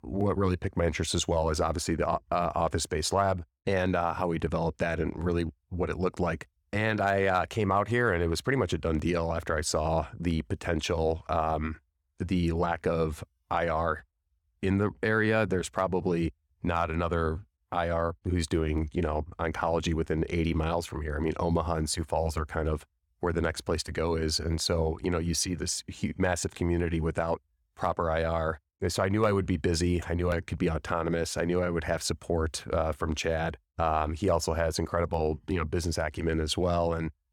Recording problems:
none

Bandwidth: 18.5 kHz